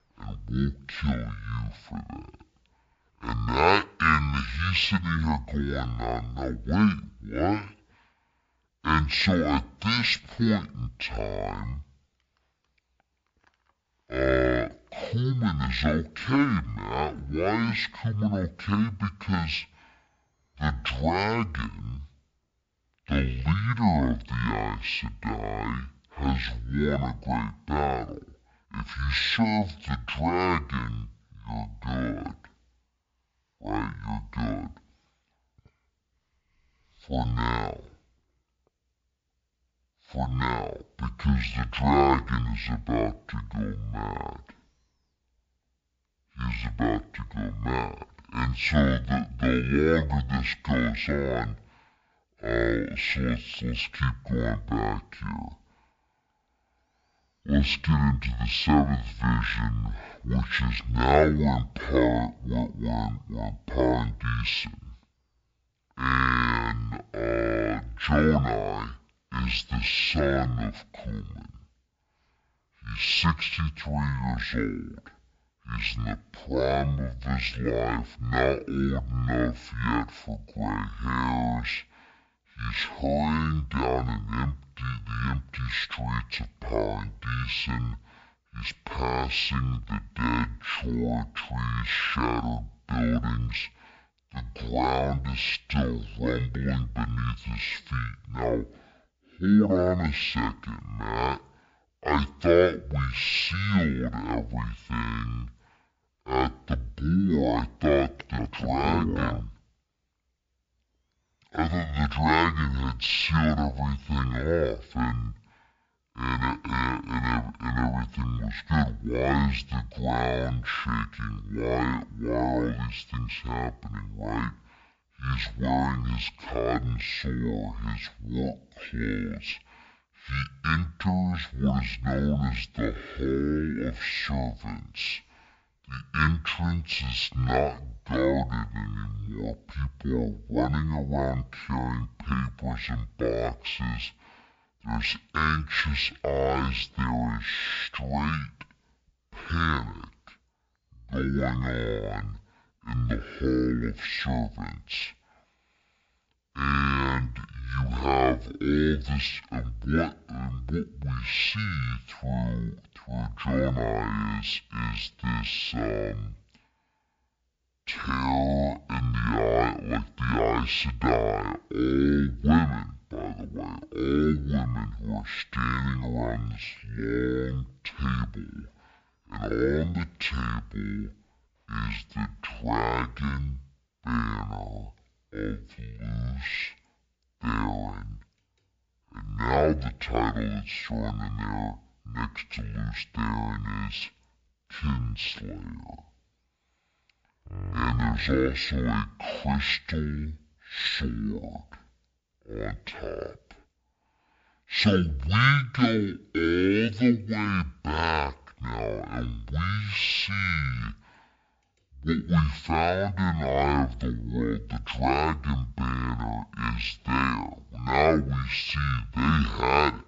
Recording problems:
wrong speed and pitch; too slow and too low; 0.5 times normal speed

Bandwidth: 7.5 kHz